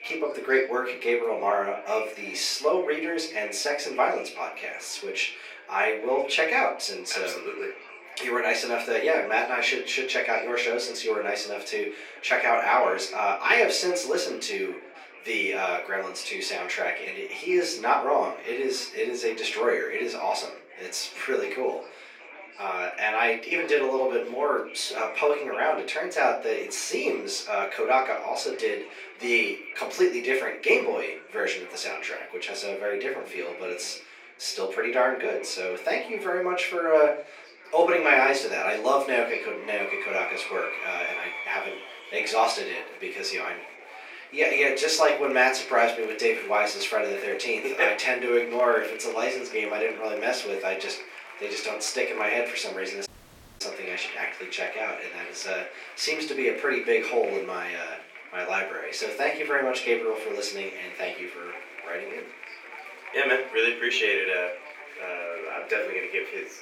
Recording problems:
off-mic speech; far
thin; very; fading below 350 Hz
room echo; slight; dies away in 0.3 s
murmuring crowd; noticeable; throughout; 15 dB below the speech
audio cutting out; at 53 s for 0.5 s

